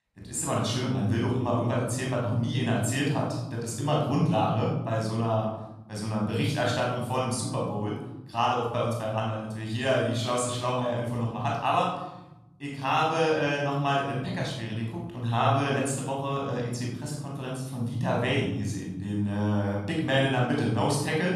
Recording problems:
off-mic speech; far
room echo; noticeable; dies away in 1.1 s

